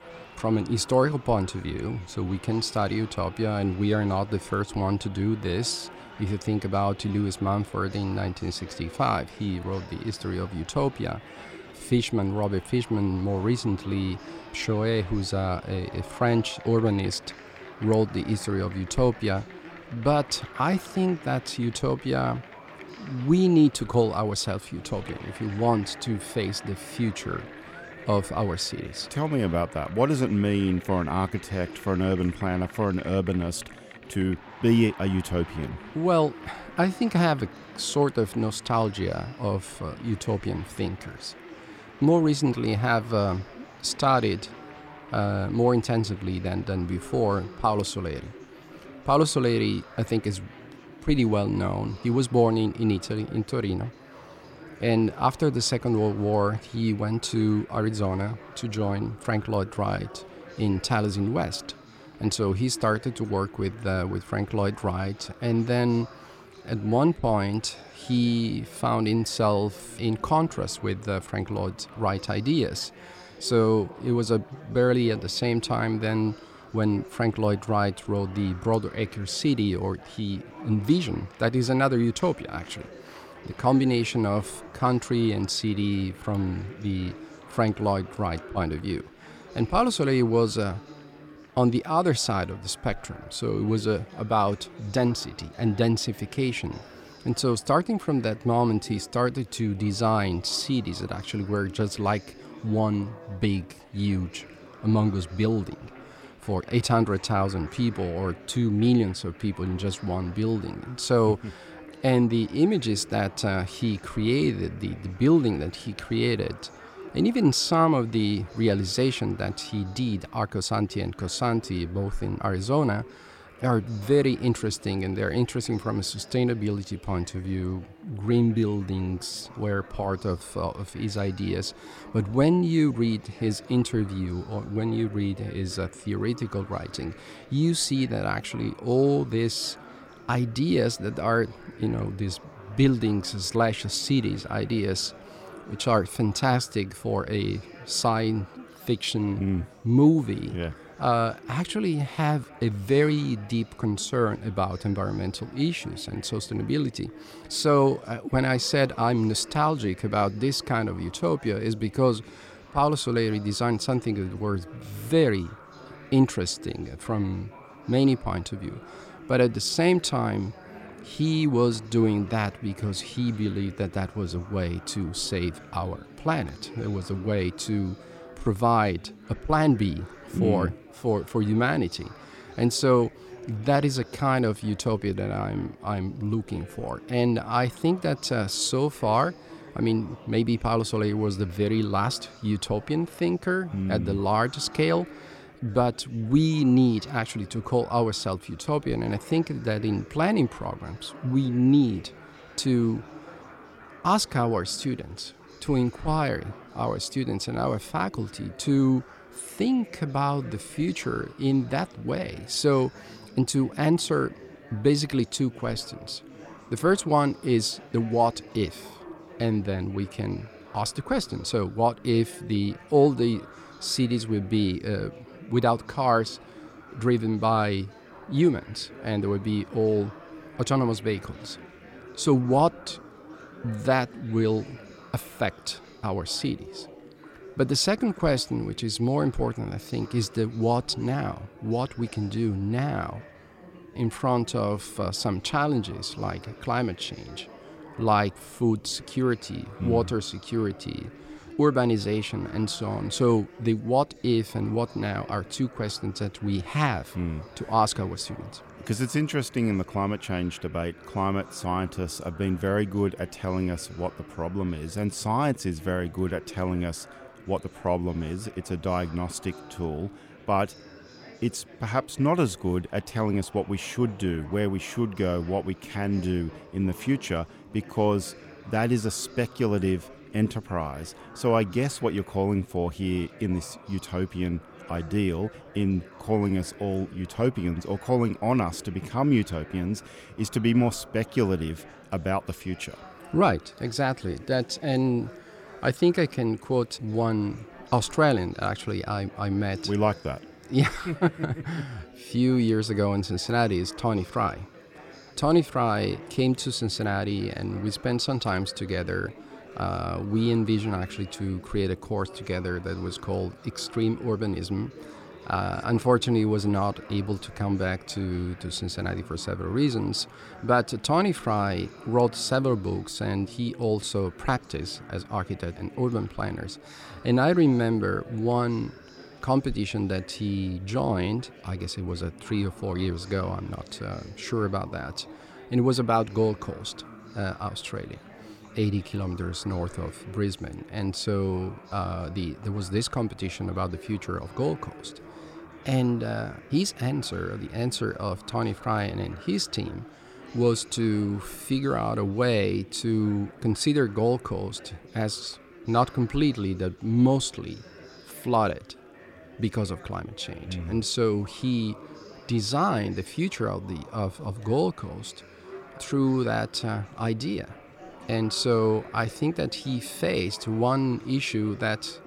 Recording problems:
chatter from many people; noticeable; throughout; 20 dB below the speech

